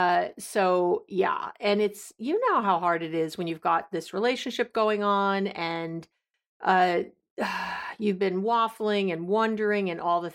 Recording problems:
abrupt cut into speech; at the start

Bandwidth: 16 kHz